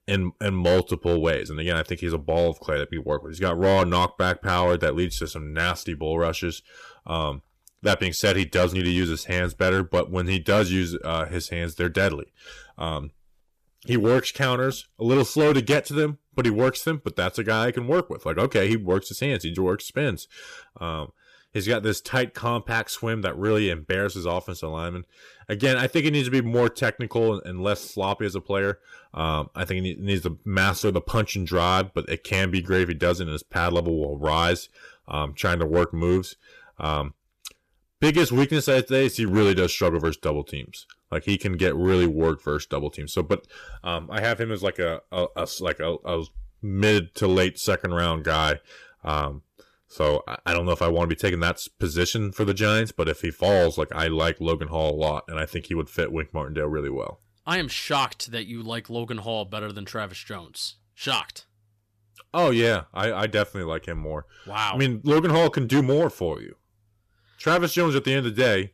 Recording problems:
distortion; slight; 3% of the sound clipped

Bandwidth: 14.5 kHz